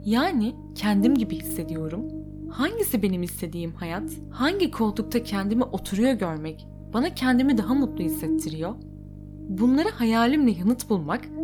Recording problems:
electrical hum; noticeable; throughout; 50 Hz, 10 dB below the speech

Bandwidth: 18 kHz